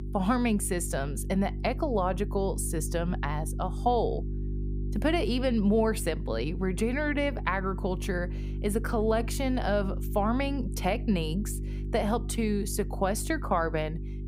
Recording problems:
electrical hum; noticeable; throughout; 50 Hz, 15 dB below the speech

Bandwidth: 15.5 kHz